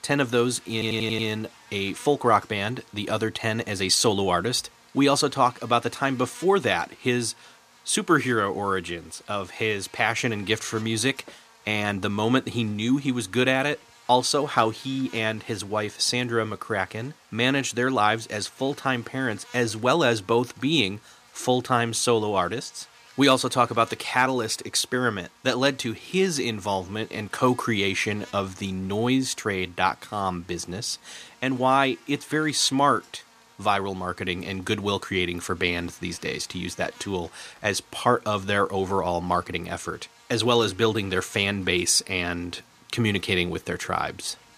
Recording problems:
electrical hum; faint; throughout; 60 Hz, 25 dB below the speech
audio stuttering; at 0.5 s

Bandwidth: 14.5 kHz